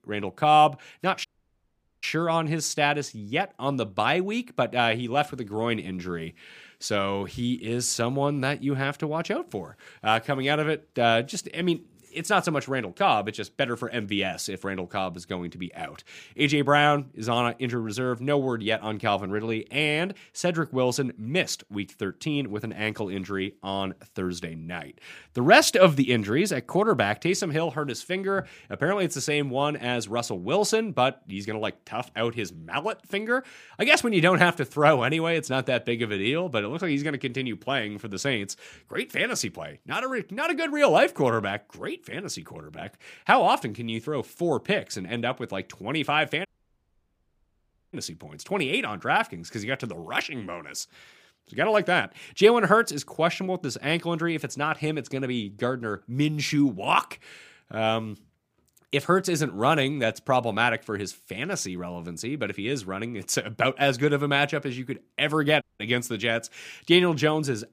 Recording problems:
audio cutting out; at 1.5 s for 1 s, at 46 s for 1.5 s and at 1:06

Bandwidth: 15 kHz